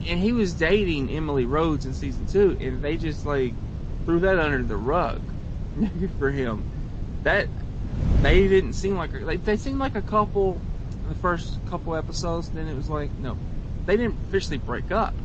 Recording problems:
garbled, watery; slightly; nothing above 7.5 kHz
wind noise on the microphone; occasional gusts; 15 dB below the speech

